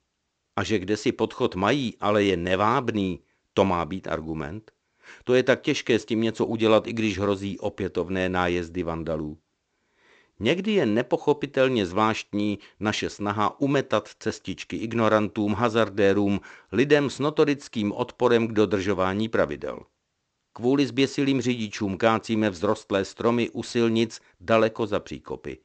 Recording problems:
high frequencies cut off; noticeable; nothing above 8 kHz

